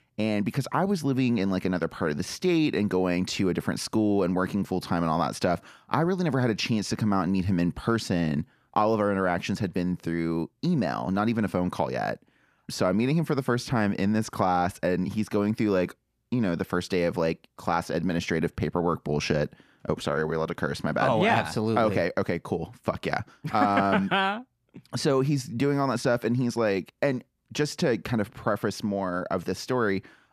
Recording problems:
none

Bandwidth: 14.5 kHz